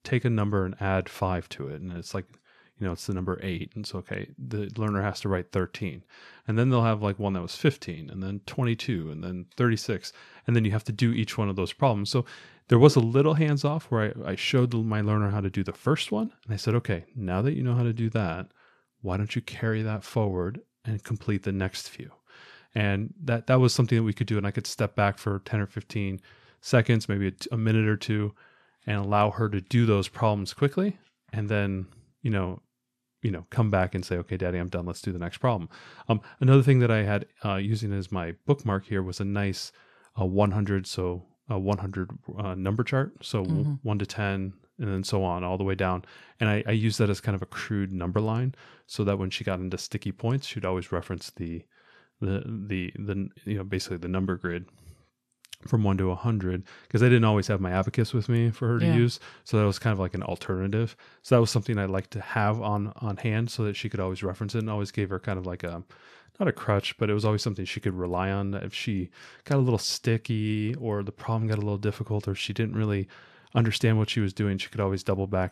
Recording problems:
none

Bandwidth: 13.5 kHz